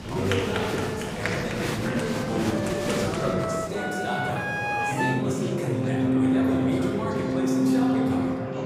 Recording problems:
off-mic speech; far
room echo; noticeable; dies away in 2.8 s
background music; very loud; throughout; 3 dB above the speech
chatter from many people; loud; throughout; 1 dB below the speech

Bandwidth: 15.5 kHz